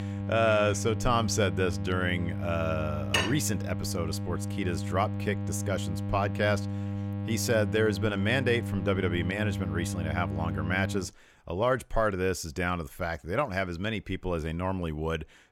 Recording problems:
electrical hum; noticeable; until 11 s; 50 Hz, 10 dB below the speech
clattering dishes; loud; at 3 s; peak 1 dB above the speech

